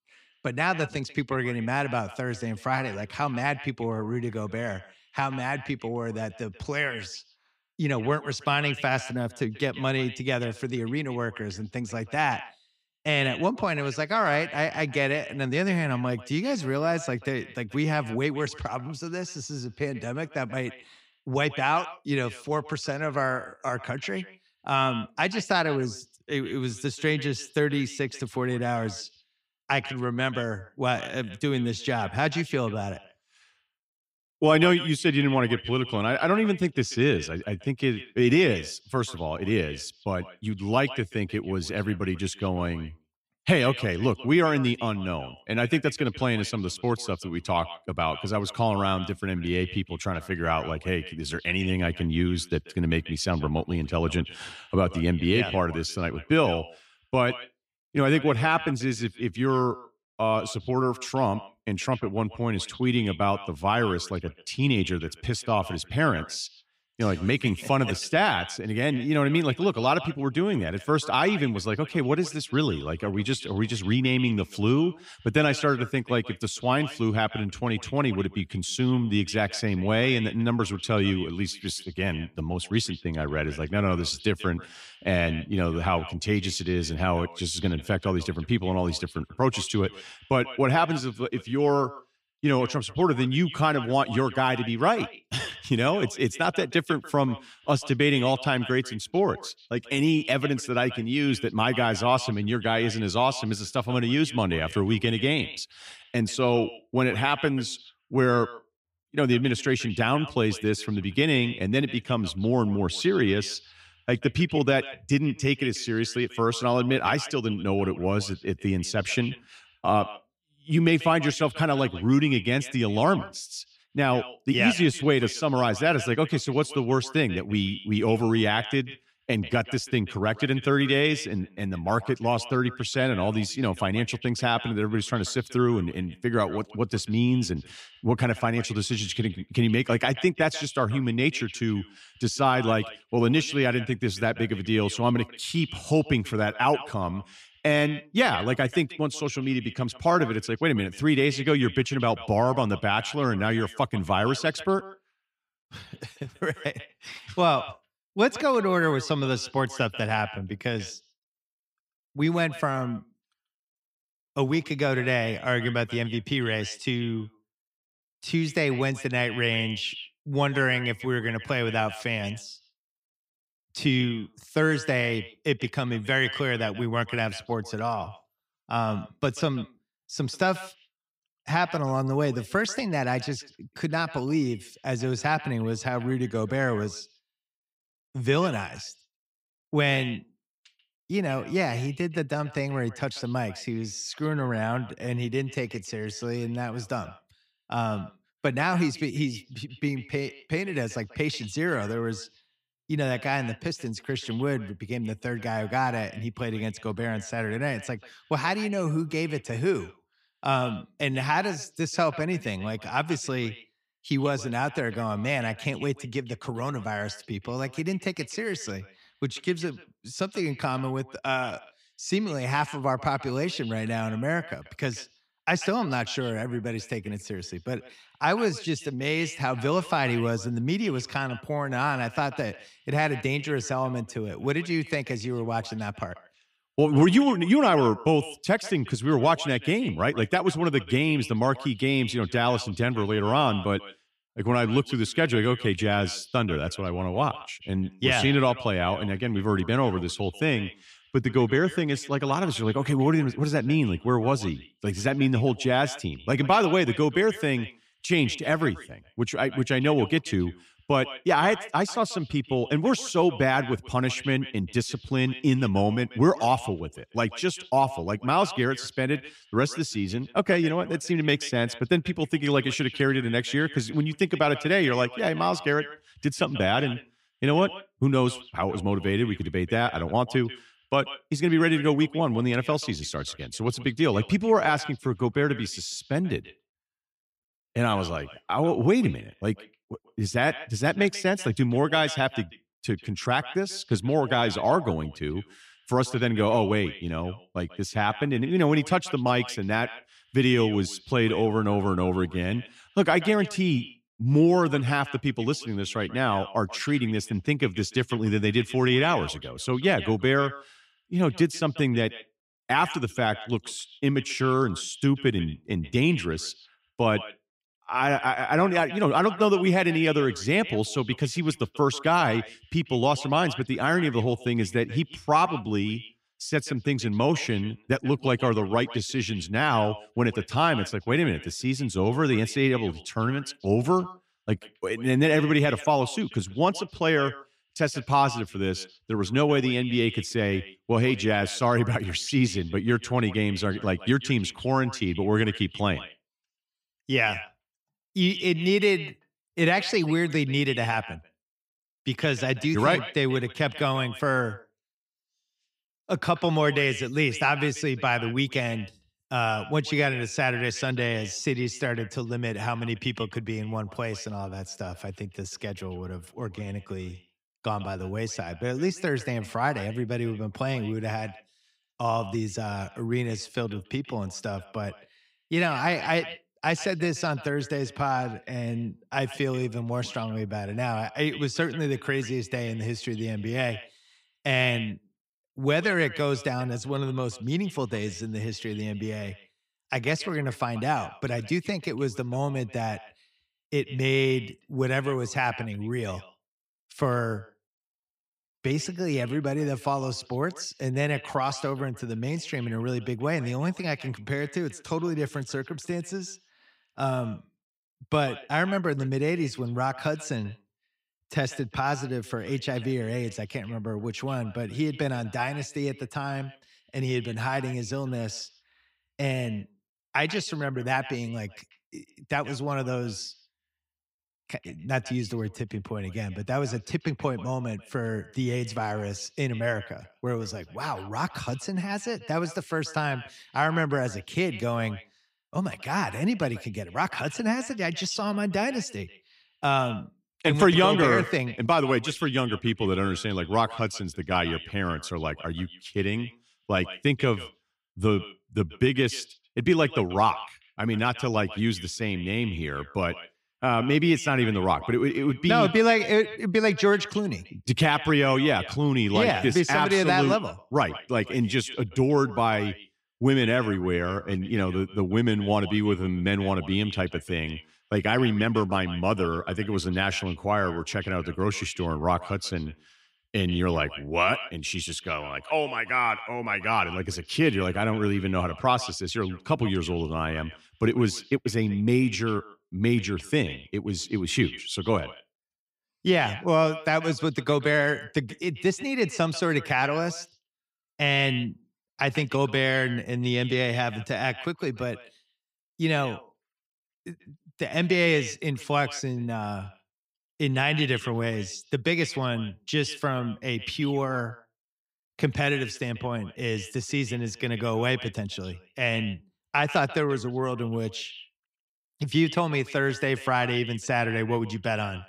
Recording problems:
echo of what is said; noticeable; throughout; 140 ms later, 15 dB below the speech

